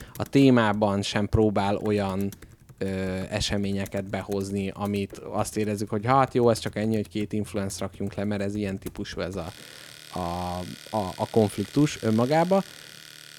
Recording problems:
household noises; noticeable; throughout; 20 dB below the speech

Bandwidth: 18.5 kHz